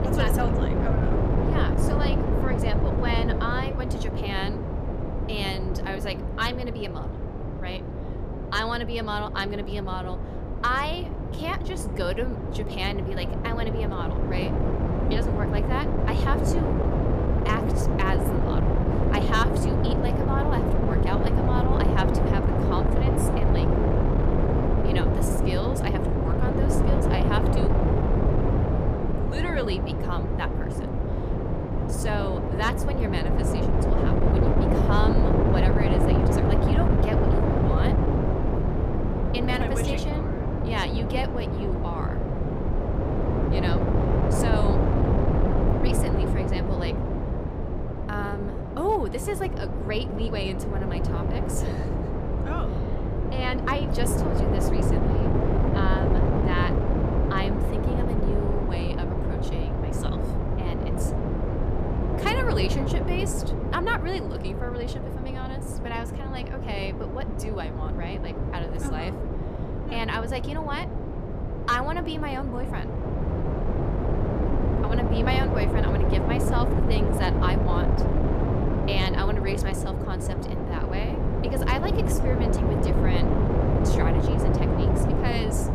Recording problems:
wind noise on the microphone; heavy; as loud as the speech

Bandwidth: 14.5 kHz